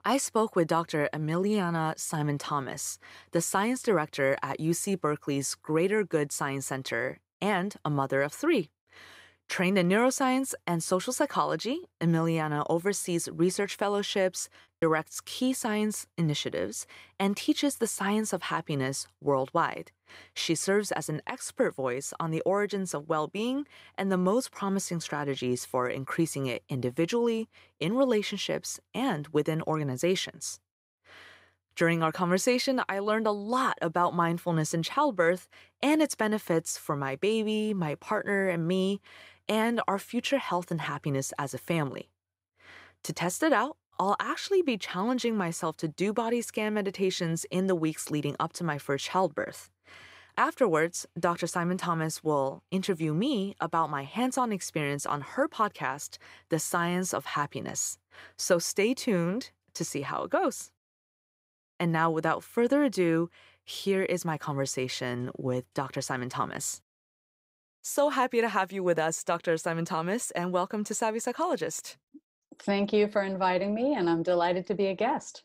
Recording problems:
choppy; very; from 13 to 15 s; 5% of the speech affected

